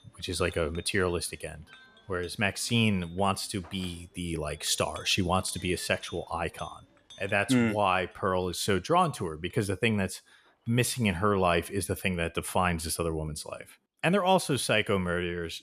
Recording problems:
household noises; faint; throughout; 25 dB below the speech

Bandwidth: 14.5 kHz